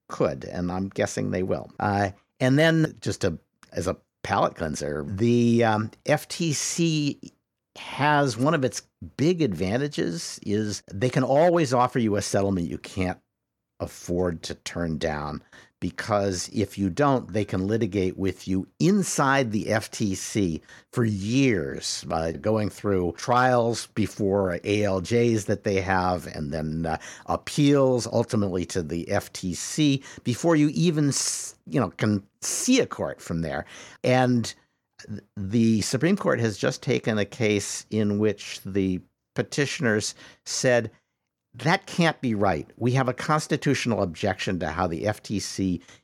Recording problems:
none

